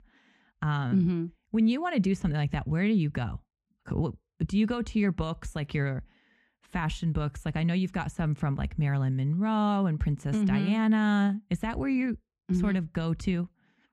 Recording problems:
muffled; slightly; fading above 2.5 kHz

